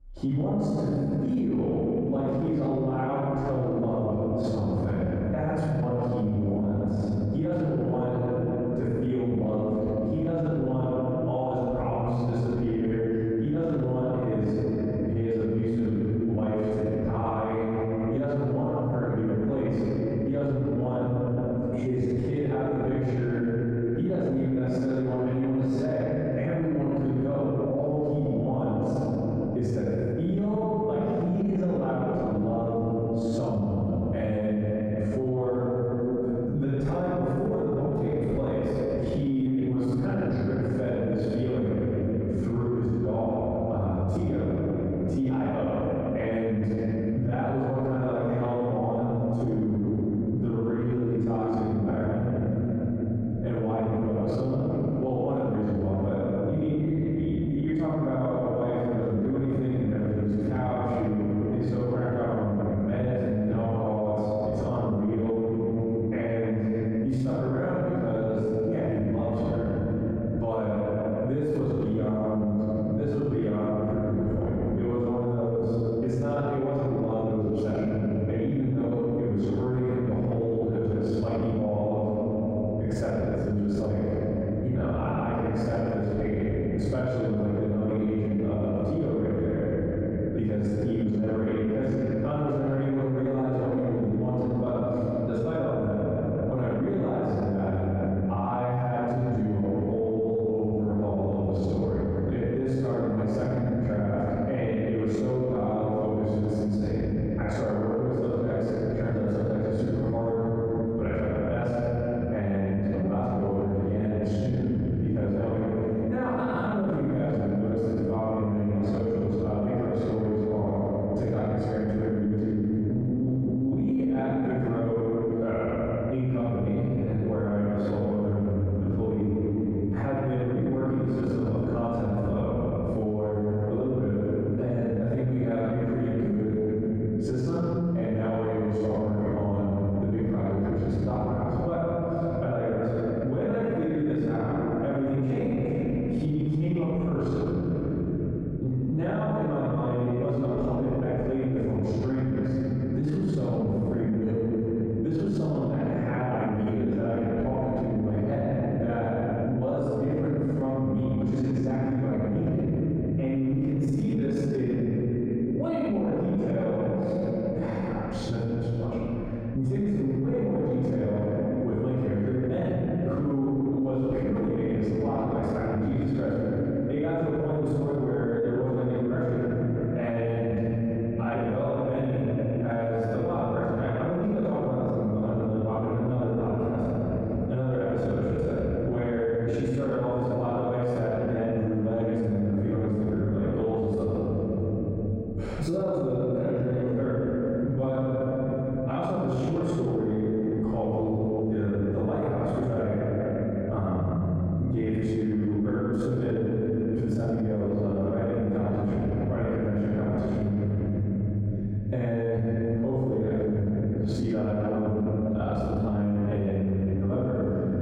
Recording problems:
room echo; strong; dies away in 3 s
off-mic speech; far
muffled; very; fading above 1.5 kHz
squashed, flat; somewhat

